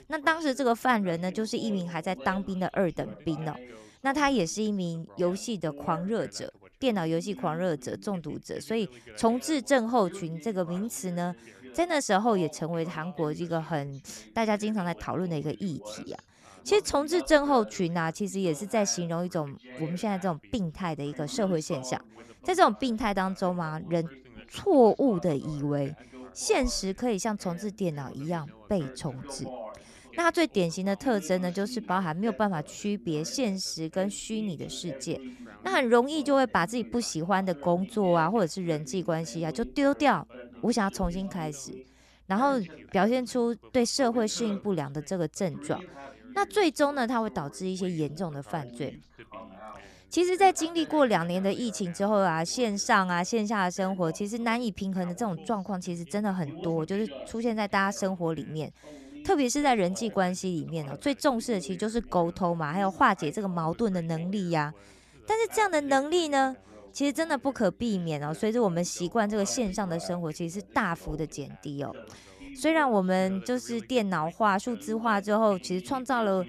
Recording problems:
background chatter; noticeable; throughout; 2 voices, 20 dB below the speech

